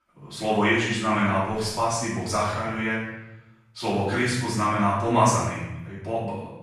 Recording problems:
room echo; strong; dies away in 0.9 s
off-mic speech; far

